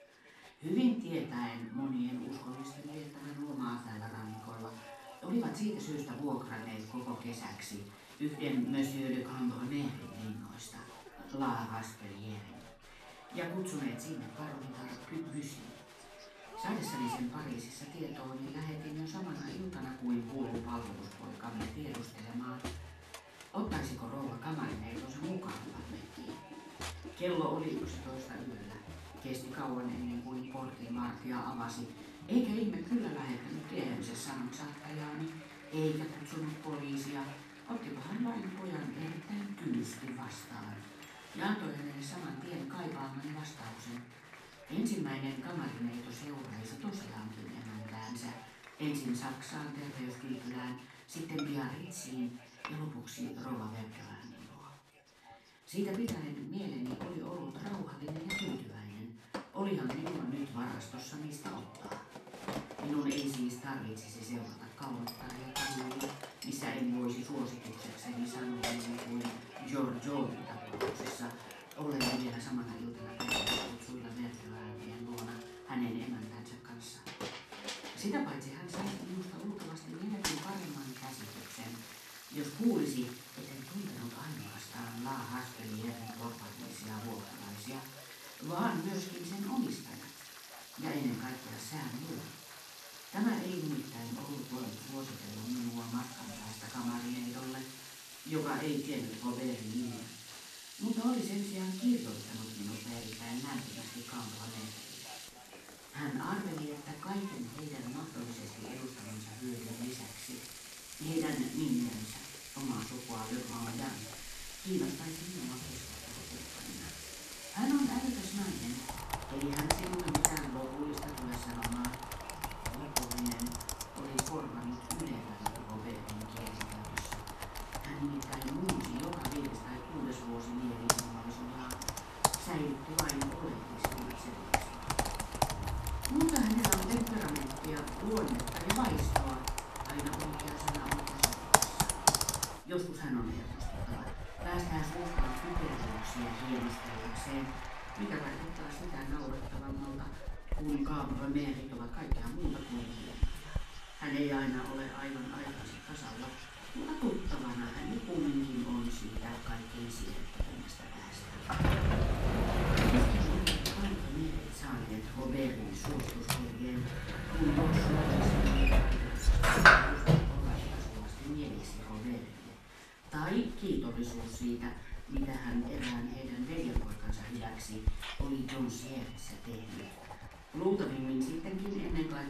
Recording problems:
off-mic speech; far
room echo; noticeable; dies away in 0.4 s
household noises; very loud; throughout; 2 dB above the speech
crowd noise; noticeable; throughout; 10 dB below the speech
voice in the background; faint; throughout; 20 dB below the speech

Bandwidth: 14 kHz